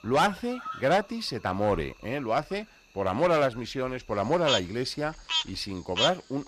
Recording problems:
animal sounds; loud; throughout; 2 dB below the speech

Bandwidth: 14.5 kHz